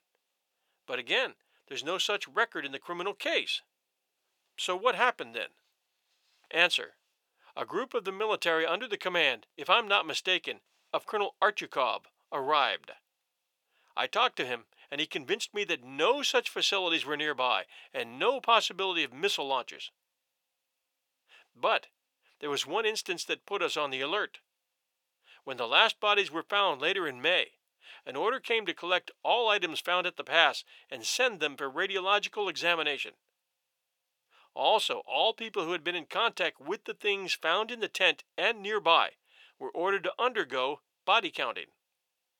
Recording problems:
thin; very; fading below 600 Hz

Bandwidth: 18.5 kHz